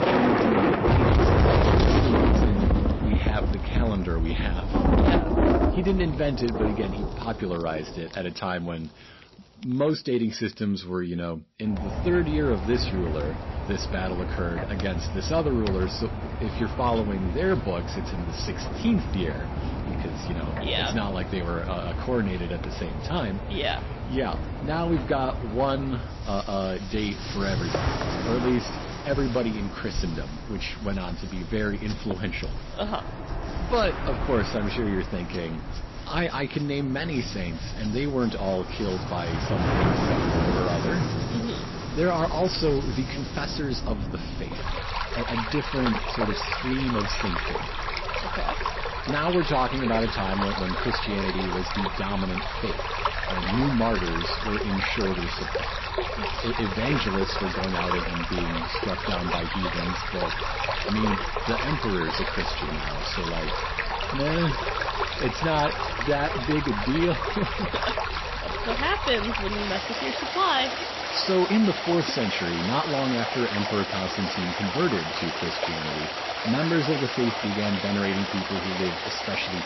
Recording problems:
distortion; heavy; 3% of the sound clipped
garbled, watery; slightly; nothing above 5.5 kHz
rain or running water; loud; throughout; as loud as the speech

